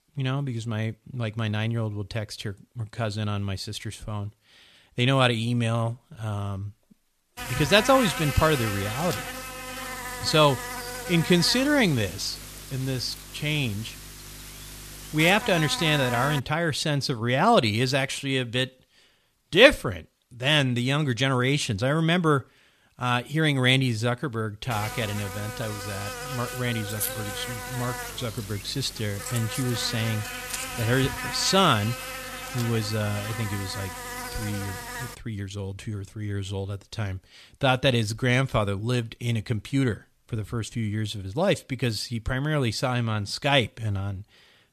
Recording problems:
electrical hum; loud; from 7.5 to 16 s and from 25 to 35 s; 50 Hz, 8 dB below the speech

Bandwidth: 14 kHz